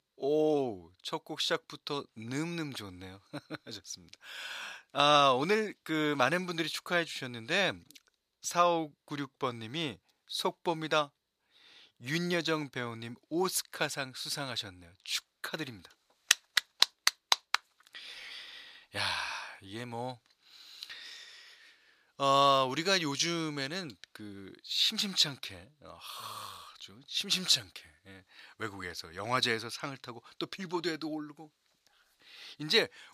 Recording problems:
thin; somewhat; fading below 1 kHz

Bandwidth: 14.5 kHz